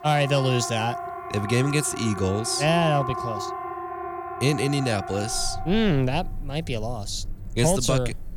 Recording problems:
alarms or sirens; loud; throughout; 9 dB below the speech

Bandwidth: 17.5 kHz